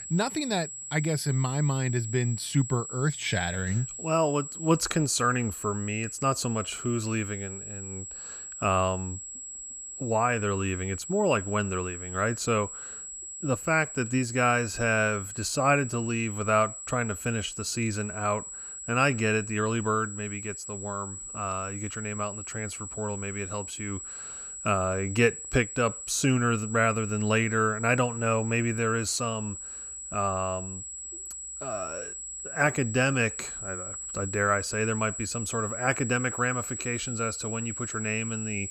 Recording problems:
high-pitched whine; loud; throughout; 7.5 kHz, 8 dB below the speech

